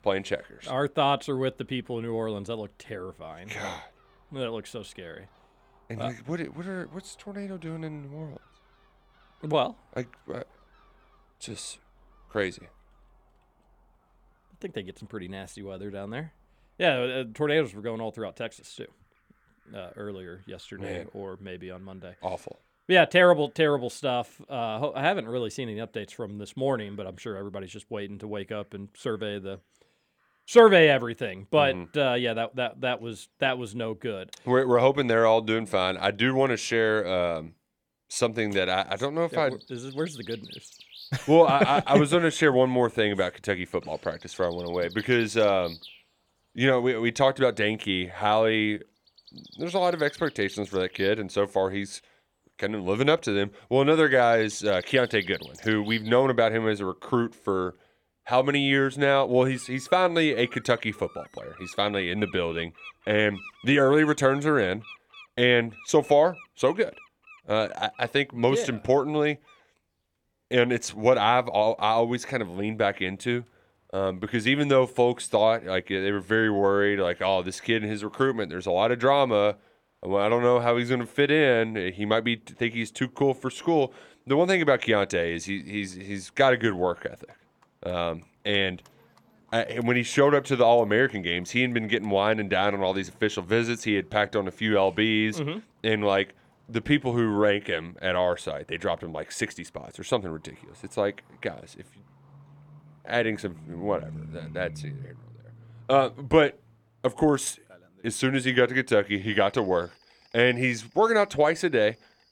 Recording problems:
animal sounds; faint; throughout; 25 dB below the speech

